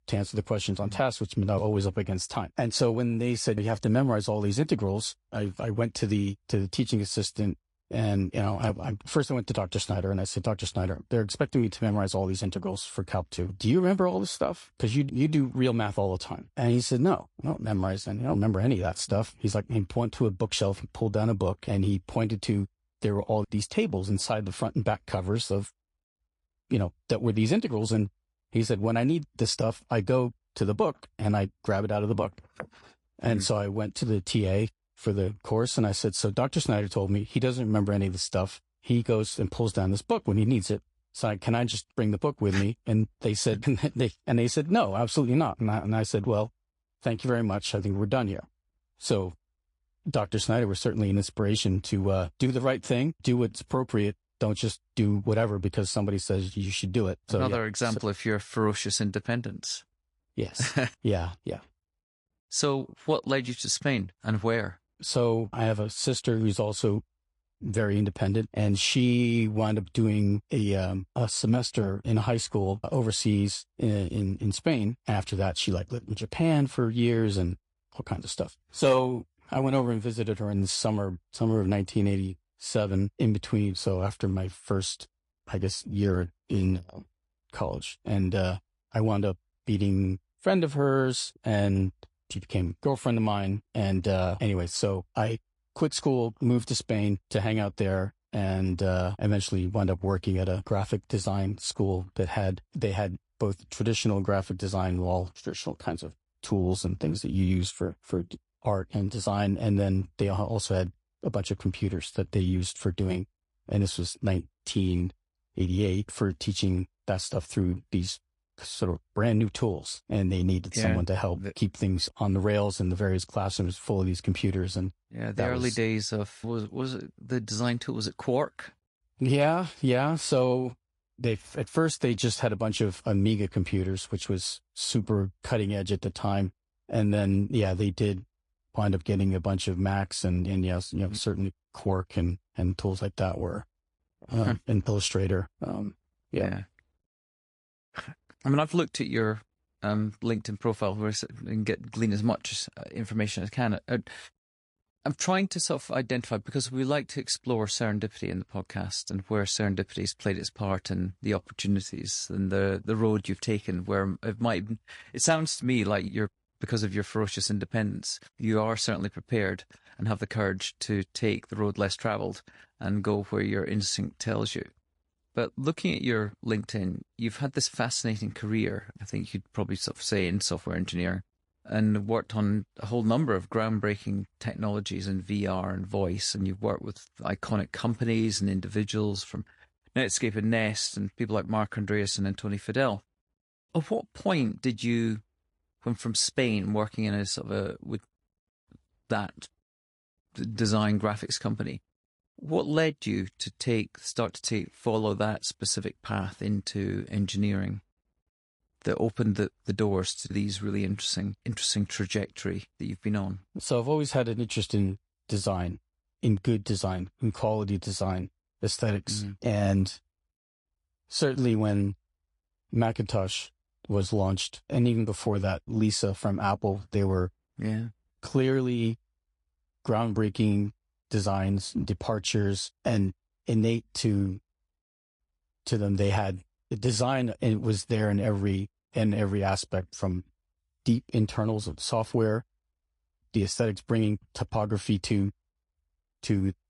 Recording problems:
garbled, watery; slightly; nothing above 9 kHz

